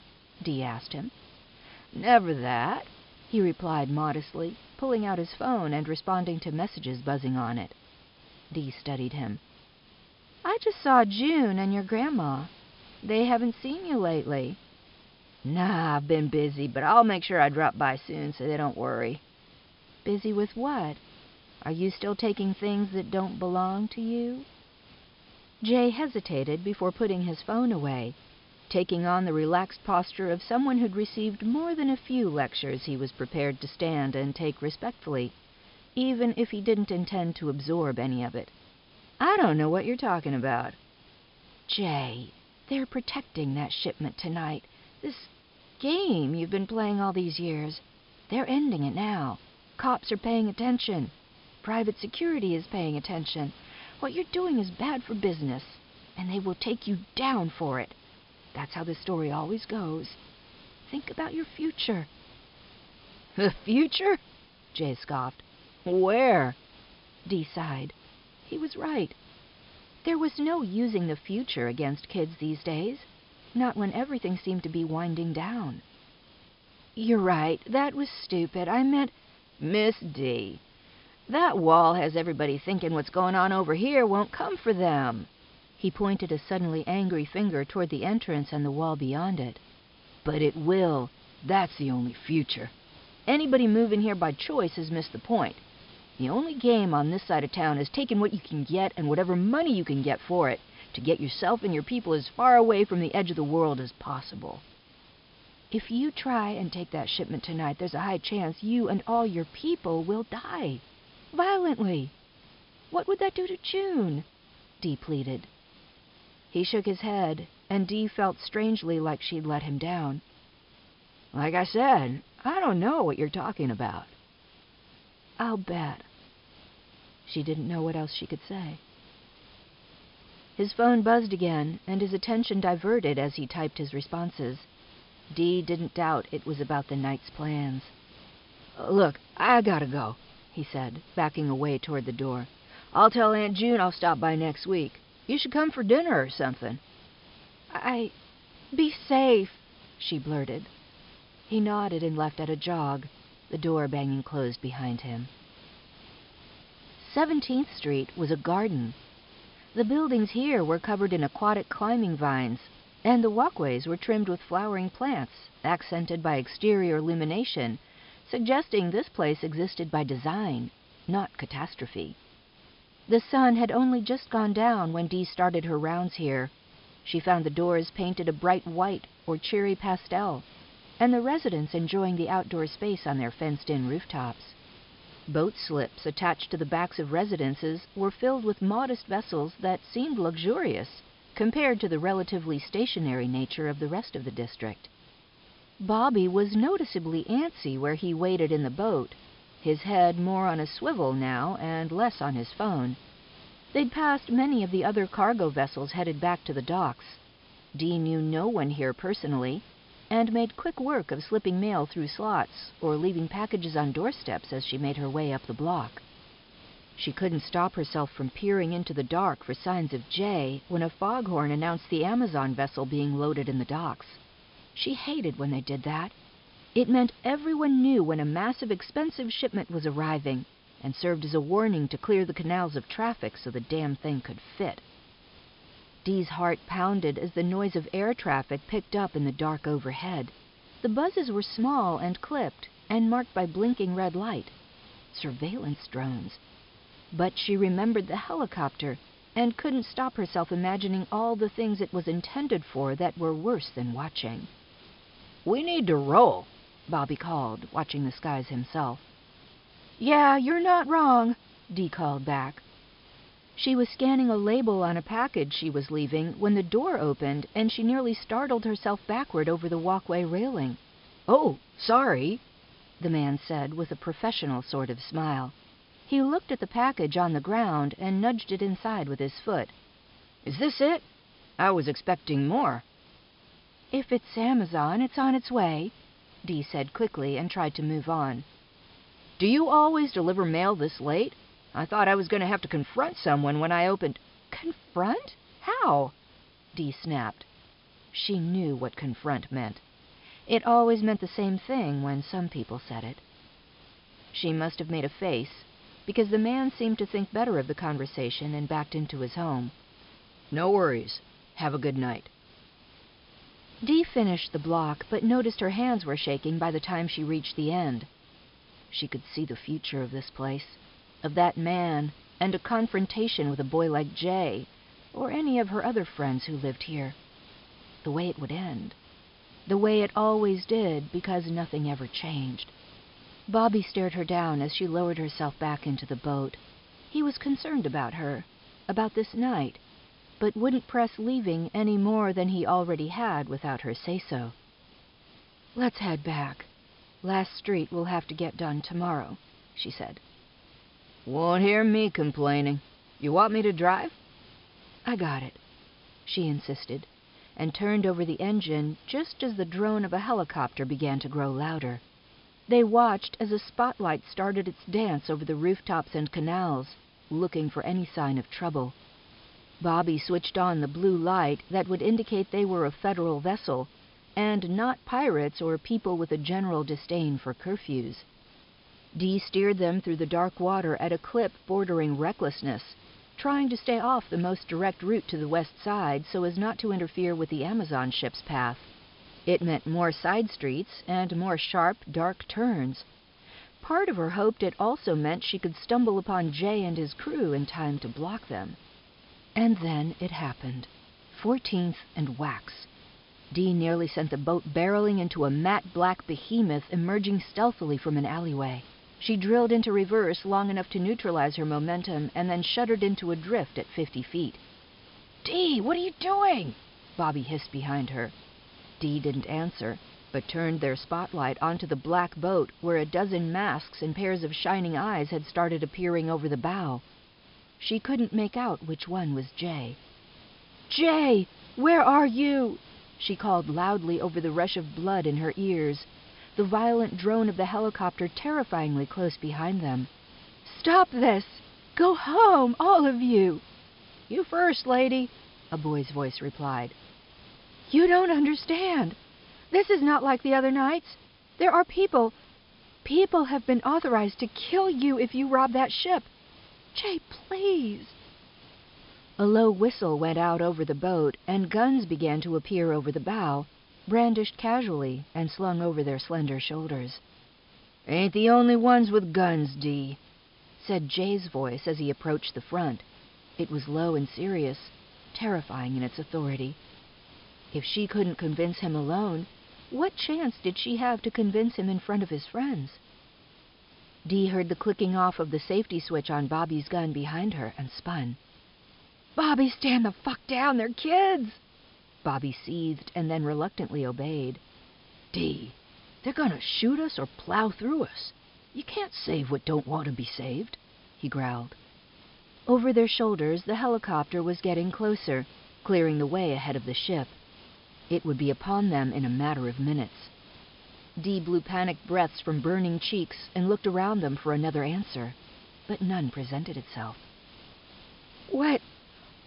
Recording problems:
high frequencies cut off; noticeable; nothing above 5.5 kHz
hiss; faint; throughout; 25 dB below the speech

